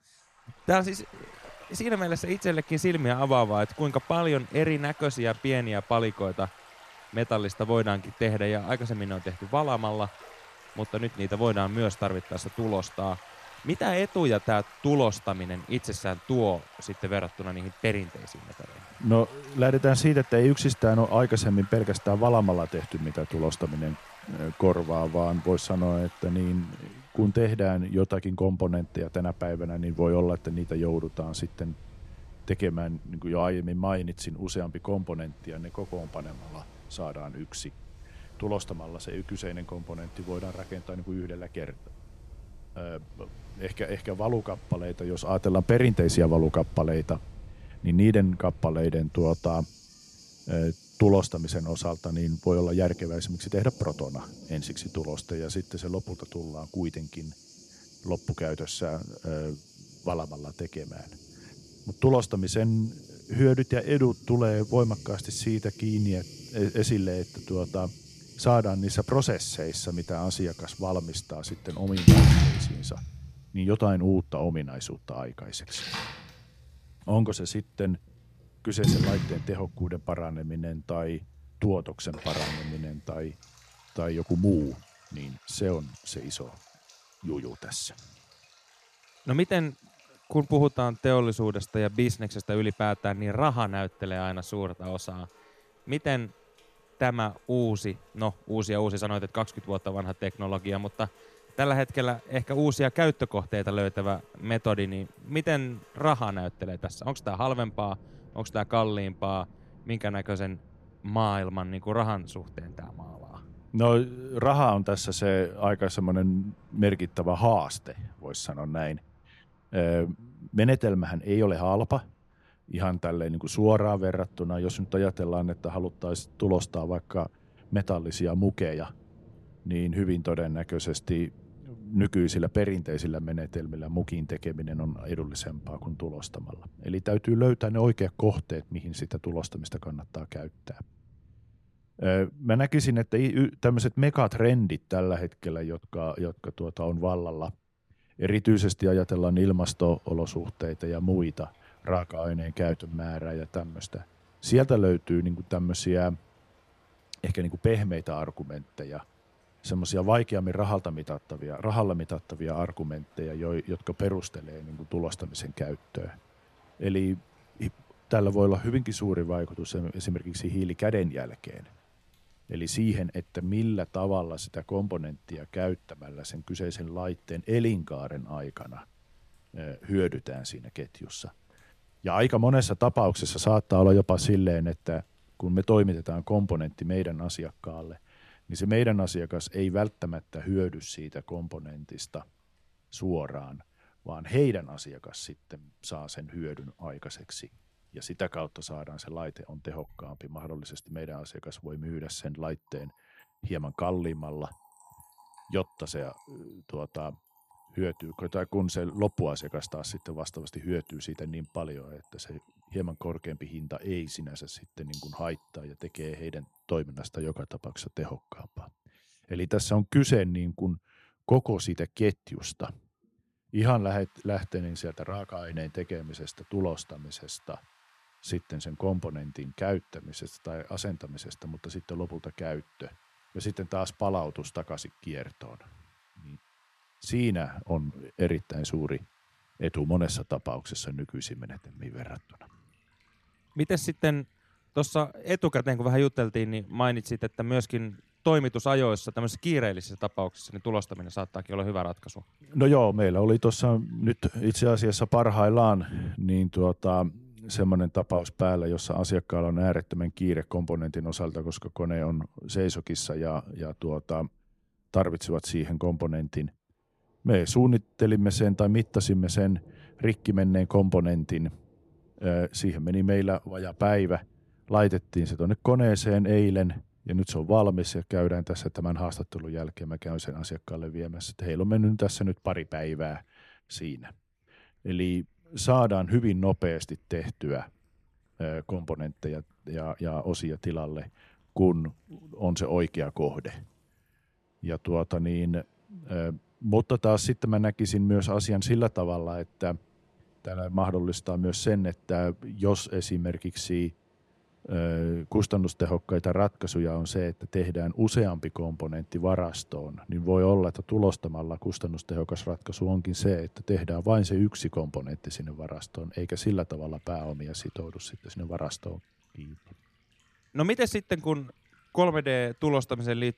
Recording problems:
rain or running water; loud; throughout; 9 dB below the speech

